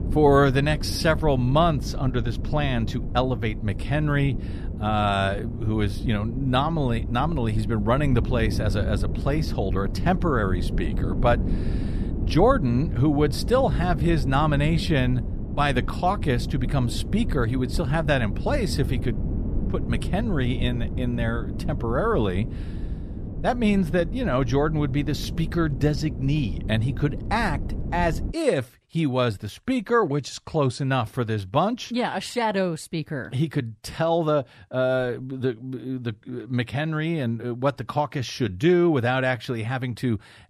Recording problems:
wind noise on the microphone; occasional gusts; until 28 s; 15 dB below the speech

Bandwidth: 14.5 kHz